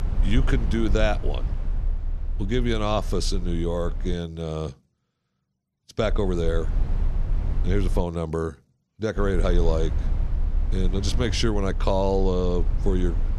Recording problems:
low rumble; noticeable; until 4 s, from 6 to 8 s and from 9 s on; 15 dB below the speech

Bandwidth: 13.5 kHz